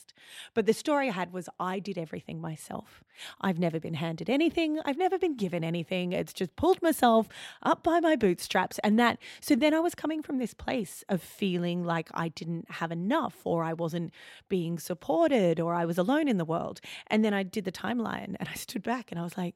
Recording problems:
none

